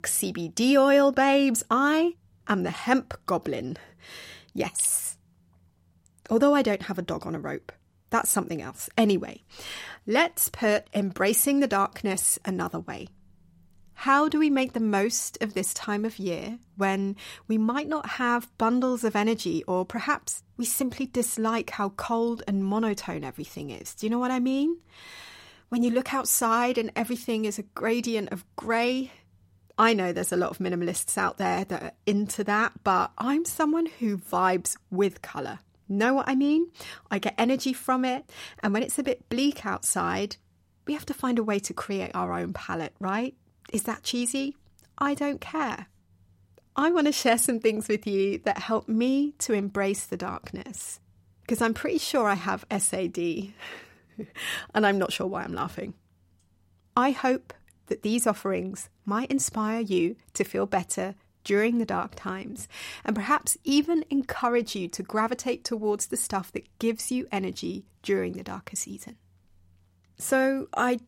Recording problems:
none

